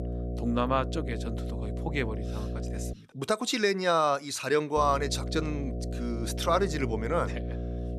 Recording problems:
electrical hum; noticeable; until 3 s and from 5 s on; 60 Hz, 15 dB below the speech

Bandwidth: 13.5 kHz